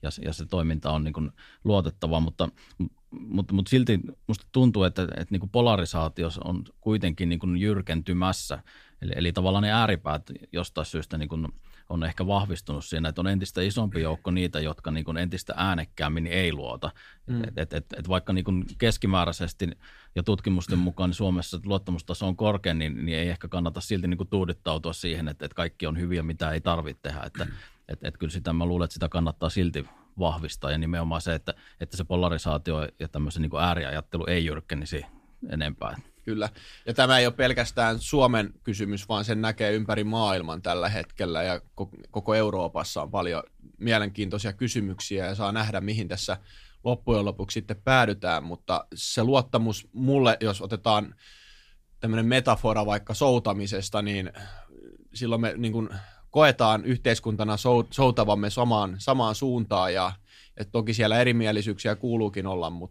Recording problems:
none

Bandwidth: 15 kHz